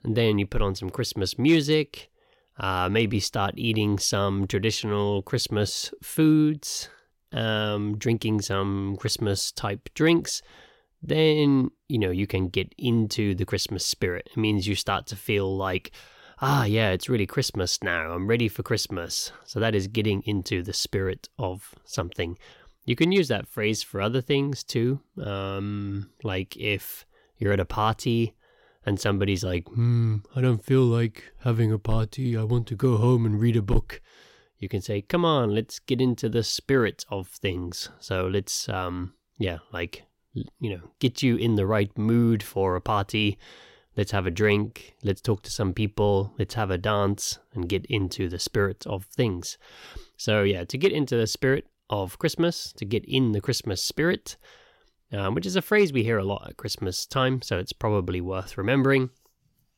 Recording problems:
none

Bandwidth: 16.5 kHz